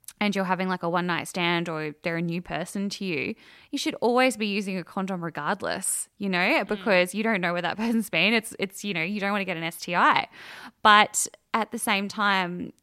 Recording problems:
none

